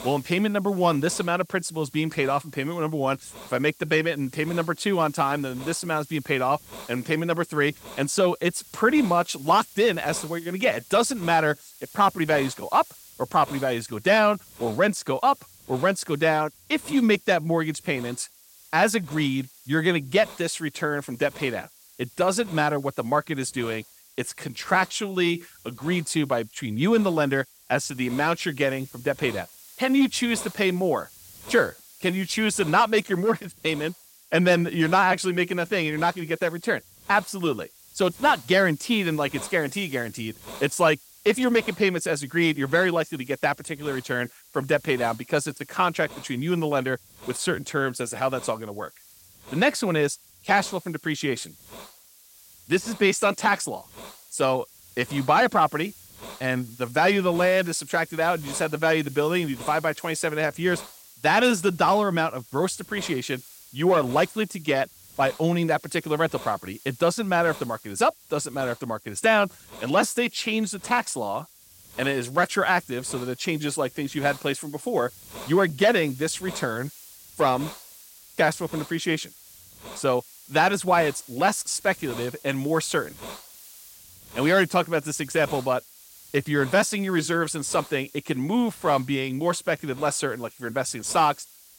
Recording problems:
hiss; noticeable; throughout; 20 dB below the speech

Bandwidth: 16.5 kHz